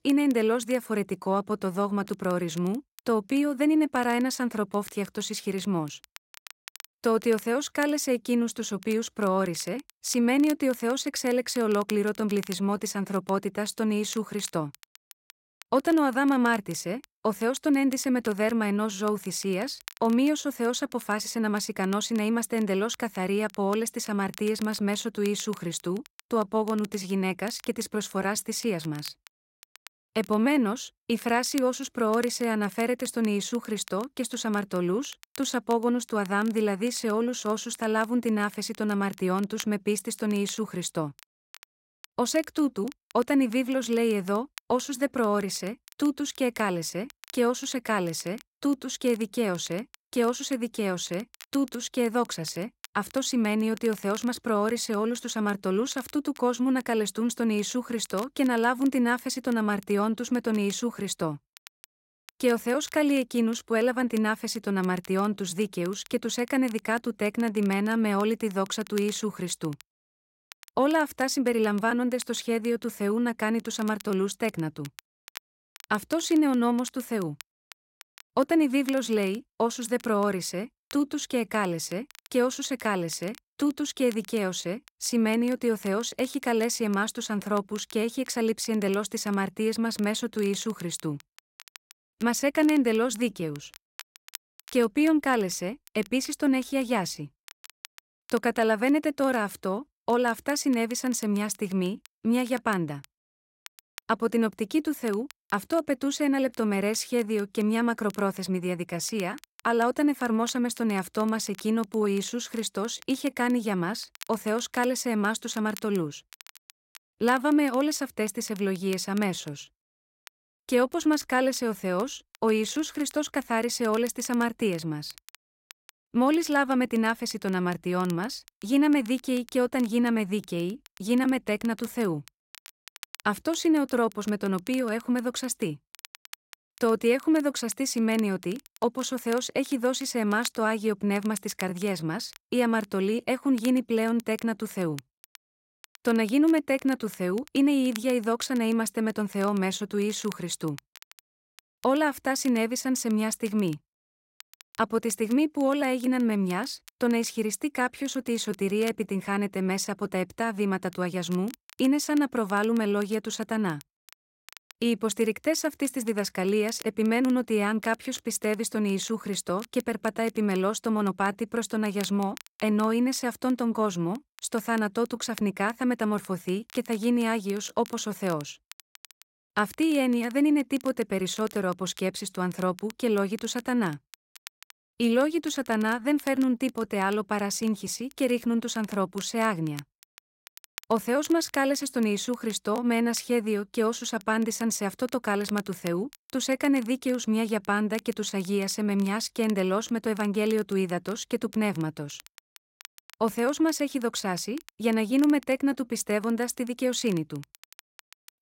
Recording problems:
crackle, like an old record; faint; 20 dB below the speech

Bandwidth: 16 kHz